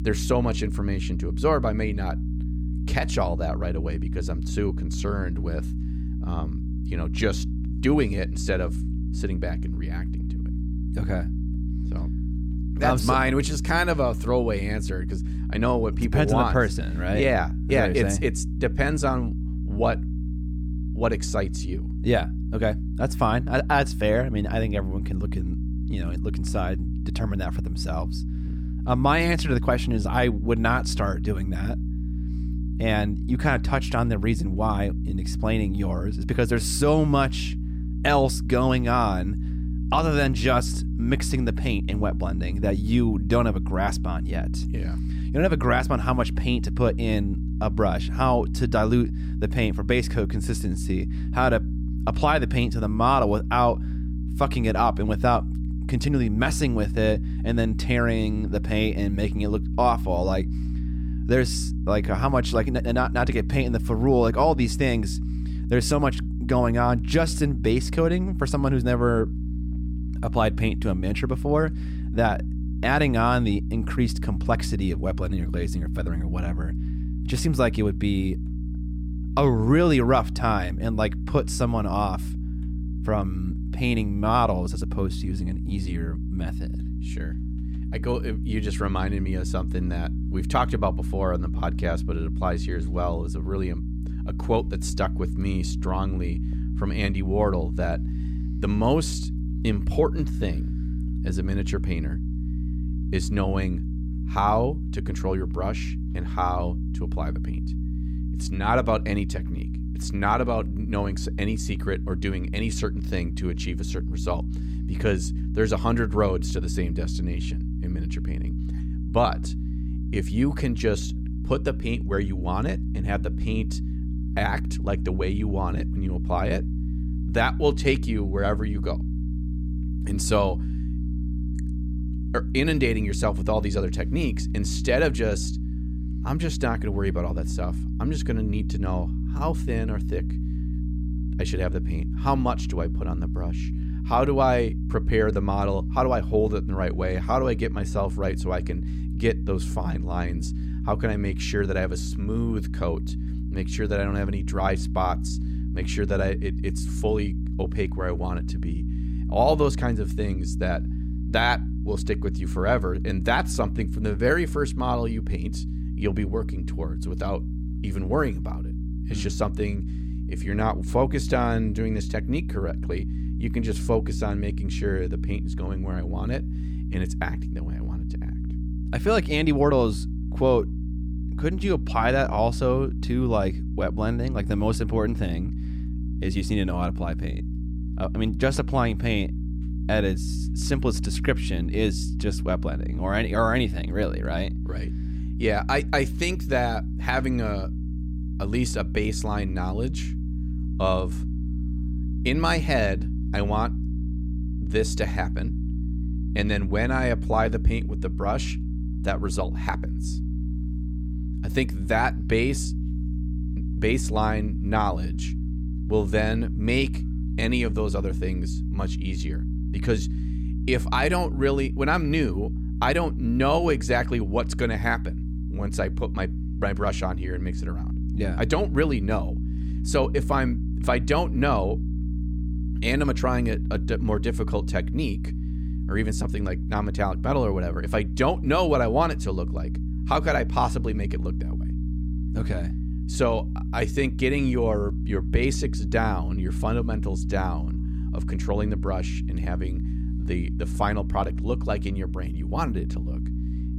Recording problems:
electrical hum; noticeable; throughout; 60 Hz, 15 dB below the speech

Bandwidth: 18.5 kHz